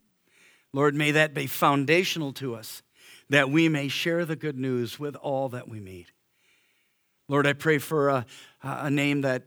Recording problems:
none

